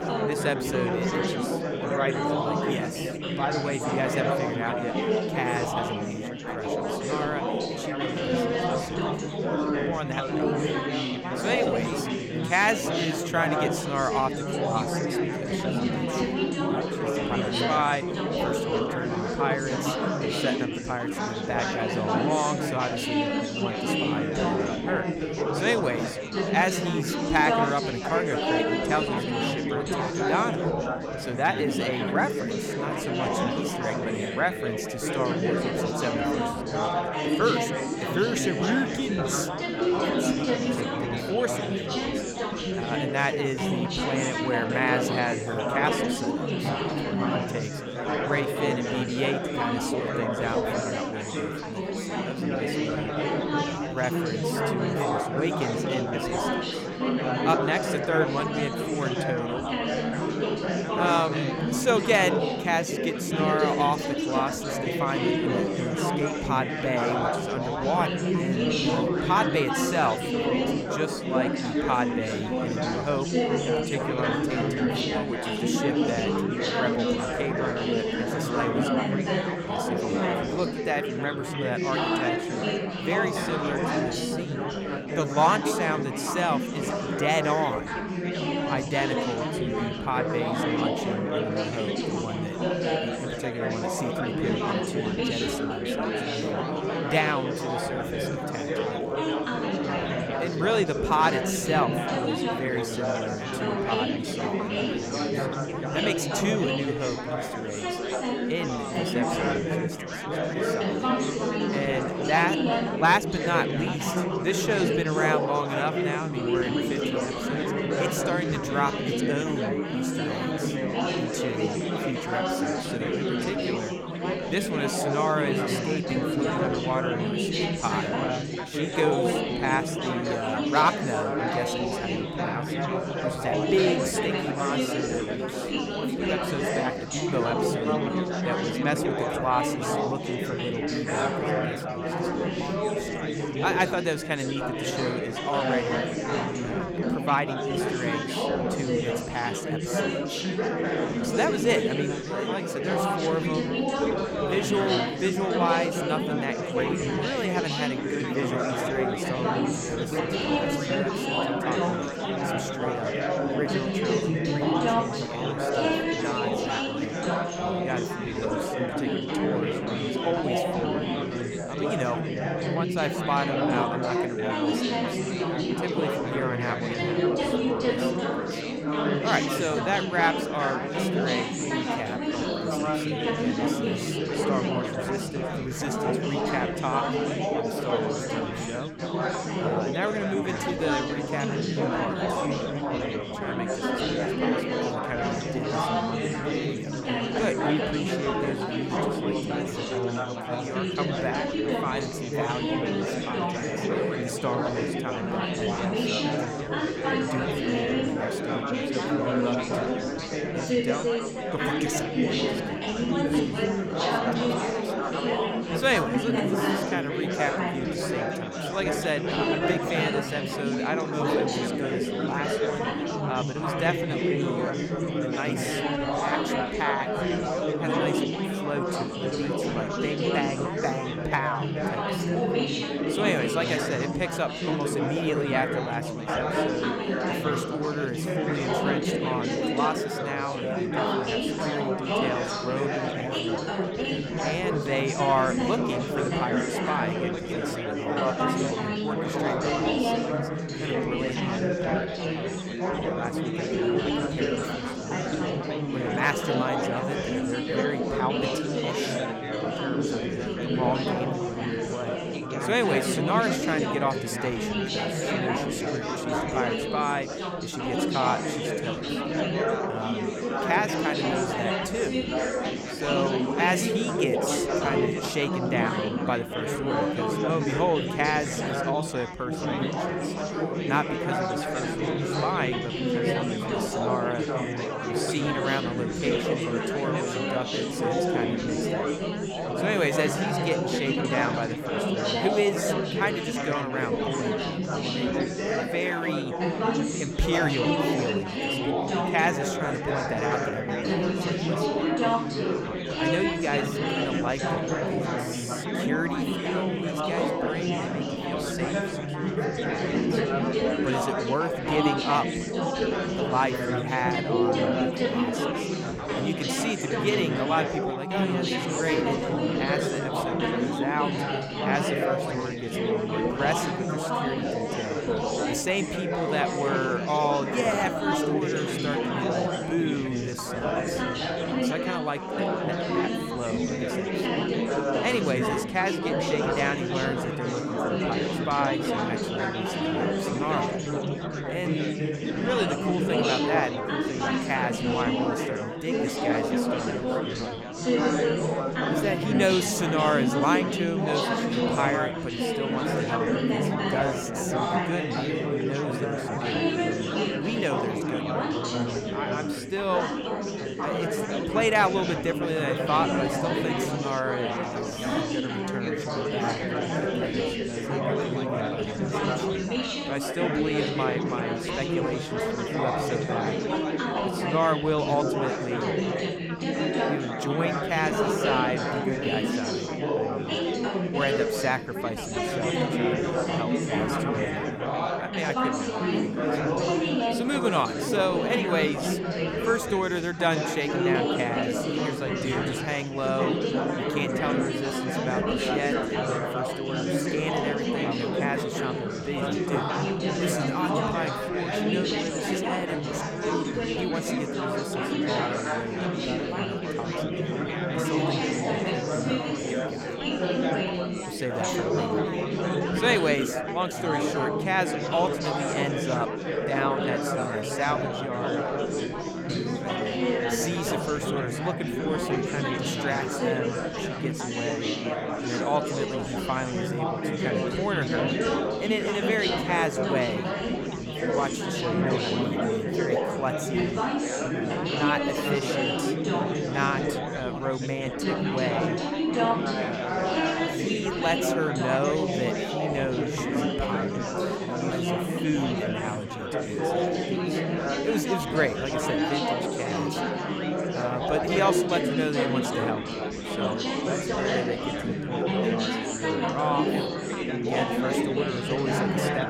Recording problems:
chatter from many people; very loud; throughout; 3 dB above the speech

